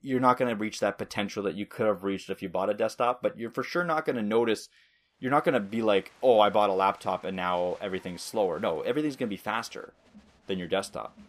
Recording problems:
crowd noise; faint; from 5.5 s on; 30 dB below the speech

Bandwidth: 15 kHz